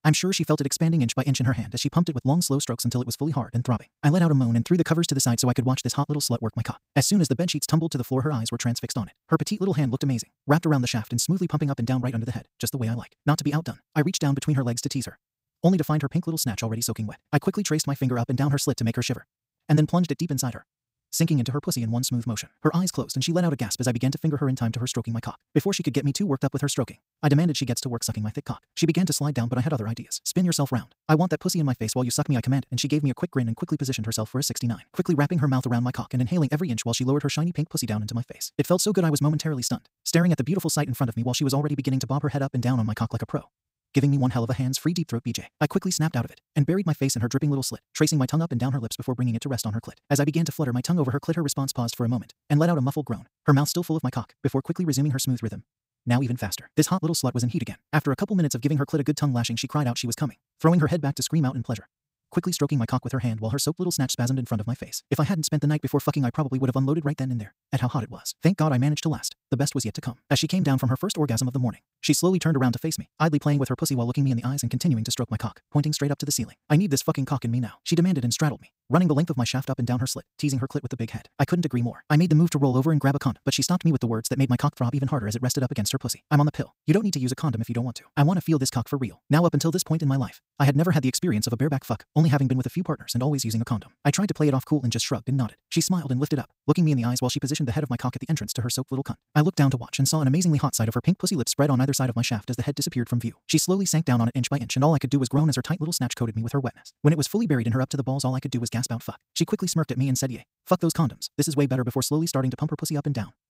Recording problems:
wrong speed, natural pitch; too fast; 1.8 times normal speed

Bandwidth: 15.5 kHz